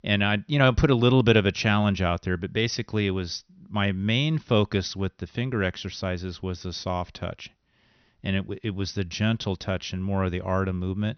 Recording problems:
high frequencies cut off; noticeable; nothing above 6 kHz

